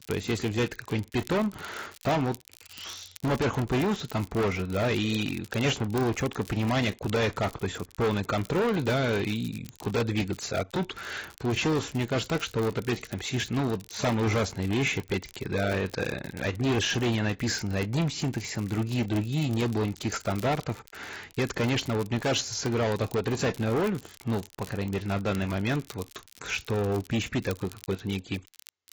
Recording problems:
distortion; heavy; 13% of the sound clipped
garbled, watery; badly; nothing above 7.5 kHz
crackle, like an old record; faint; 20 dB below the speech

